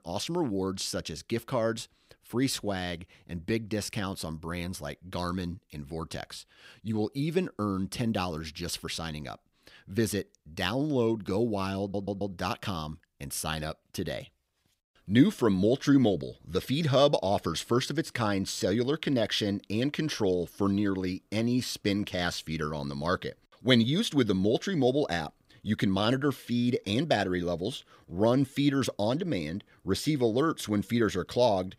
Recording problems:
audio stuttering; at 12 s

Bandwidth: 15.5 kHz